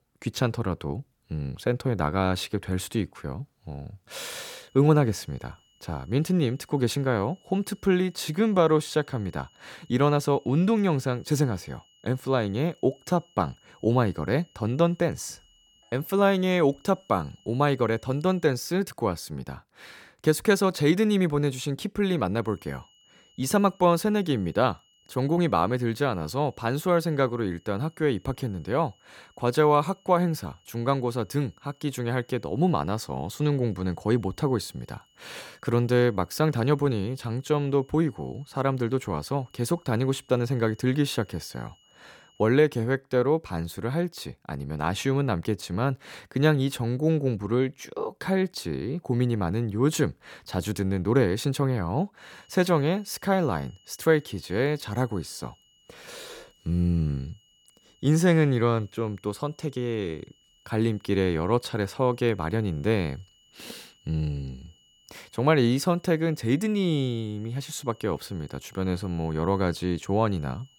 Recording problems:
high-pitched whine; faint; from 4.5 to 18 s, from 22 to 42 s and from 52 s on; 3 kHz, 35 dB below the speech

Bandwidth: 18 kHz